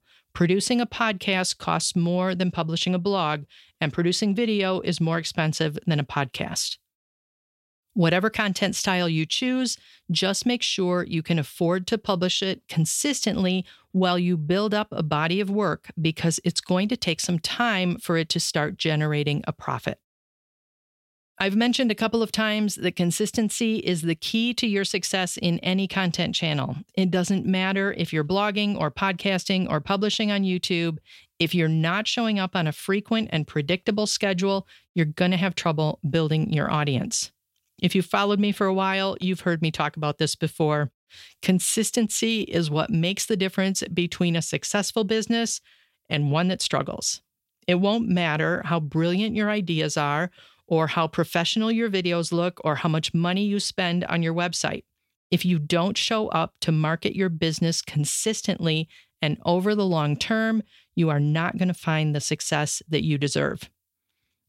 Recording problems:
none

